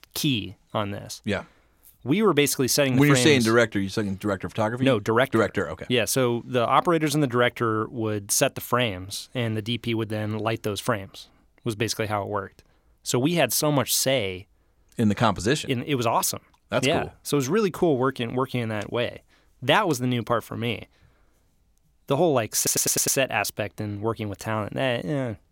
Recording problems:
audio stuttering; at 23 s

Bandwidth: 16.5 kHz